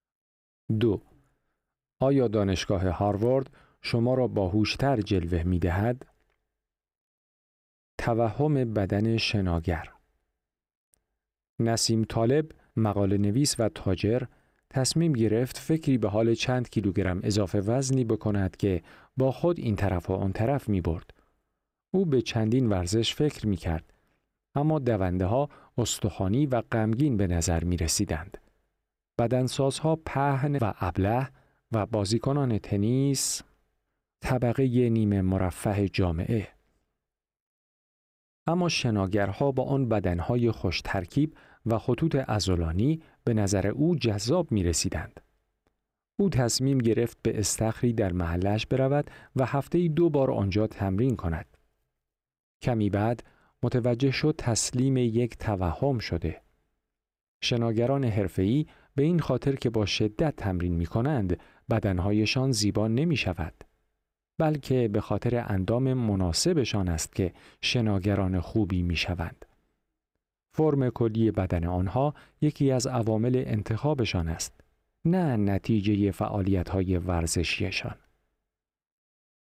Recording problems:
none

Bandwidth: 15.5 kHz